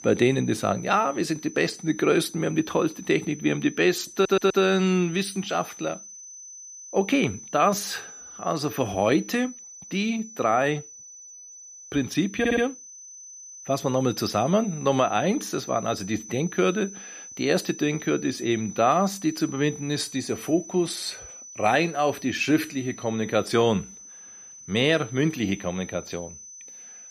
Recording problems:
high-pitched whine; noticeable; throughout; 6 kHz, 15 dB below the speech
audio stuttering; at 4 s and at 12 s

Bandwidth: 14.5 kHz